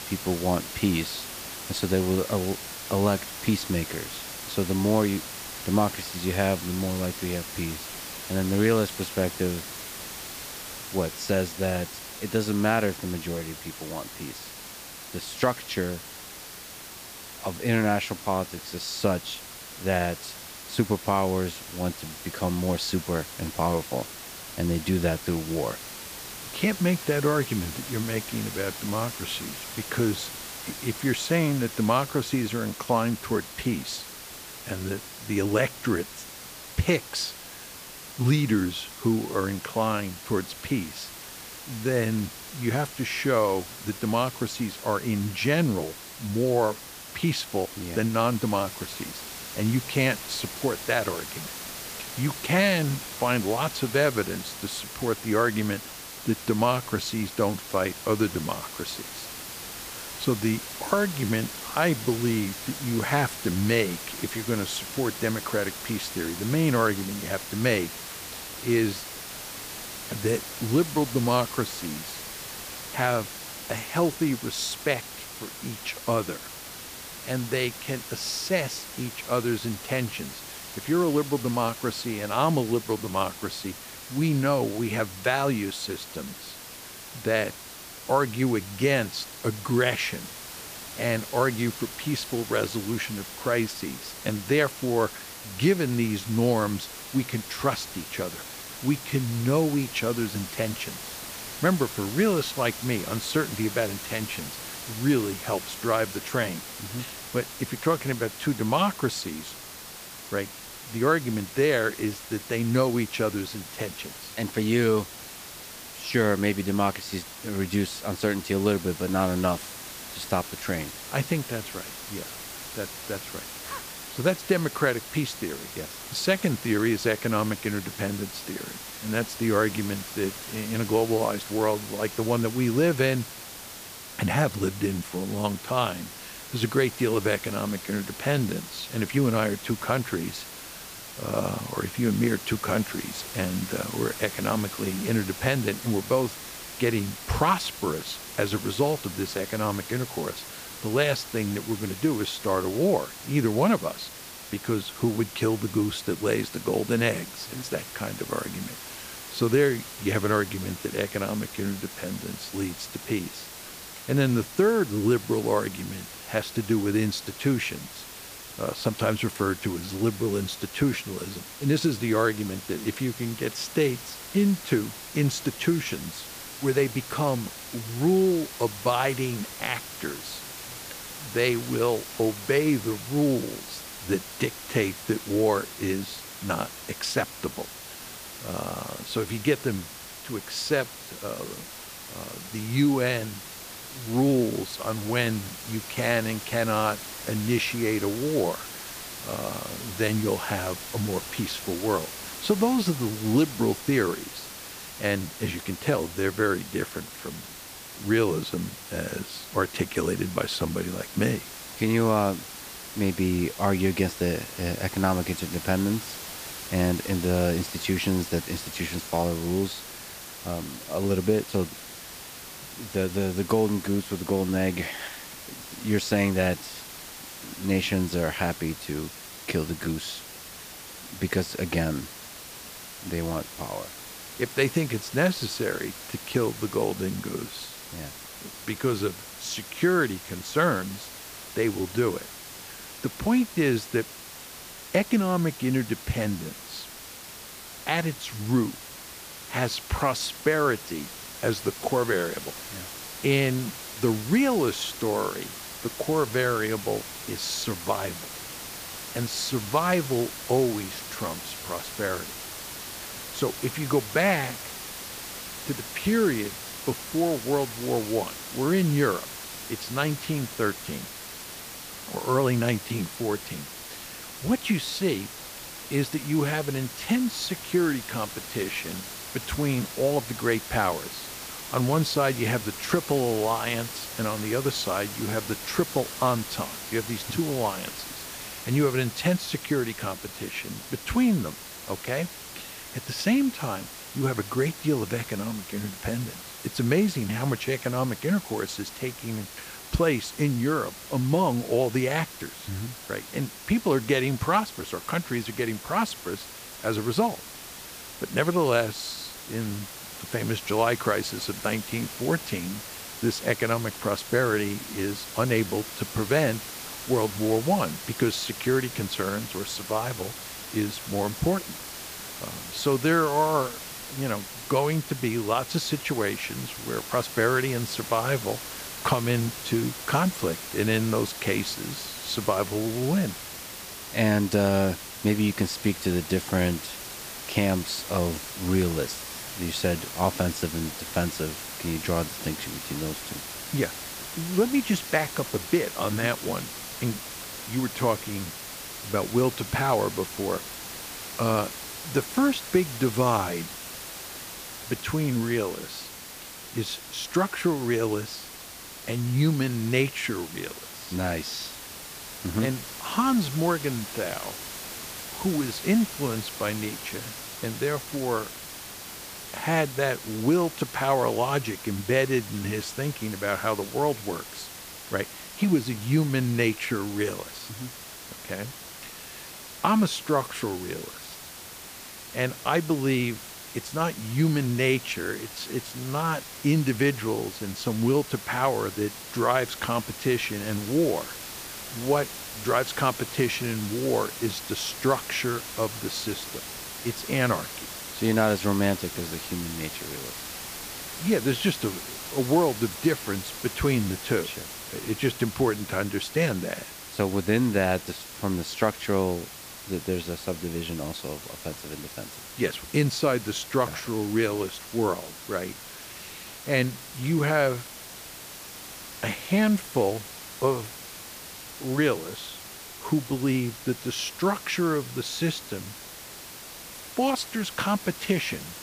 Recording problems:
hiss; loud; throughout; 10 dB below the speech

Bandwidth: 15 kHz